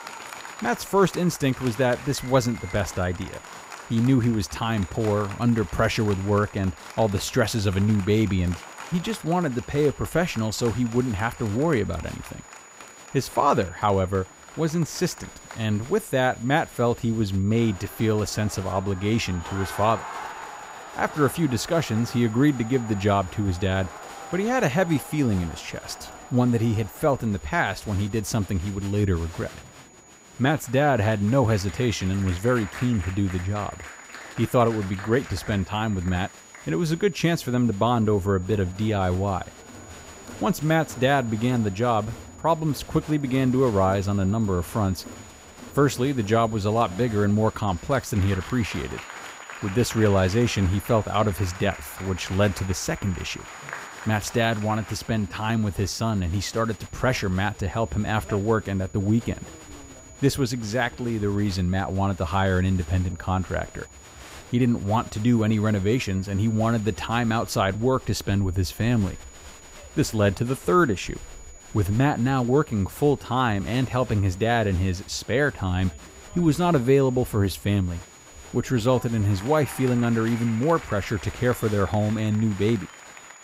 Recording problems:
crowd noise; noticeable; throughout; 15 dB below the speech
high-pitched whine; faint; throughout; 7 kHz, 25 dB below the speech

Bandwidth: 15.5 kHz